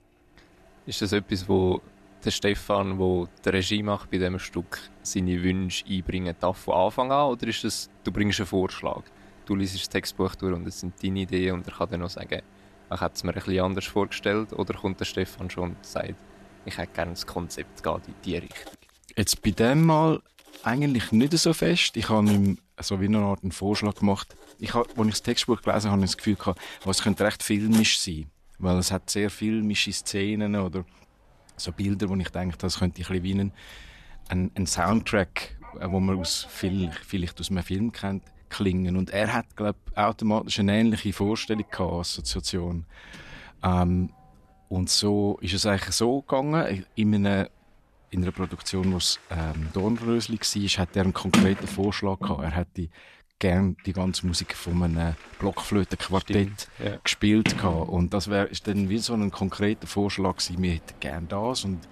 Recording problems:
household noises; noticeable; throughout; 10 dB below the speech

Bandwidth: 13.5 kHz